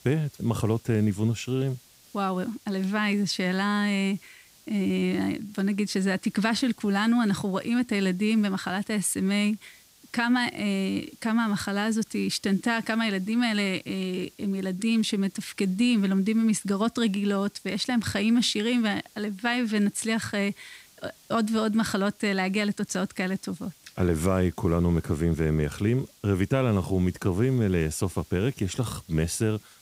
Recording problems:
hiss; faint; throughout; 25 dB below the speech

